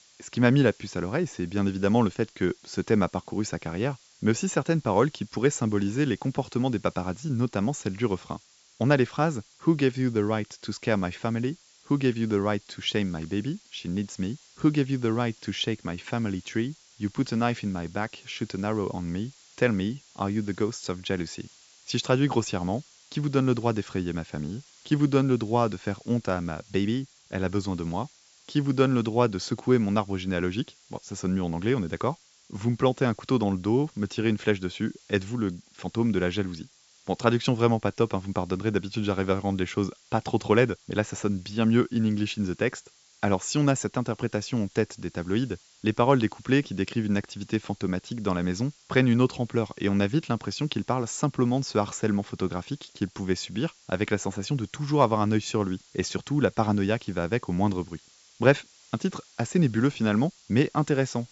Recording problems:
high frequencies cut off; noticeable; nothing above 8 kHz
hiss; faint; throughout; 25 dB below the speech

